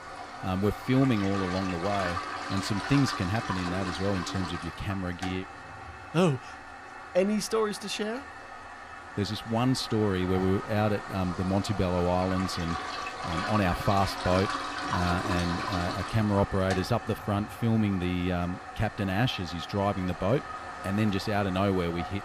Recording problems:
household noises; loud; throughout; 7 dB below the speech

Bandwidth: 15 kHz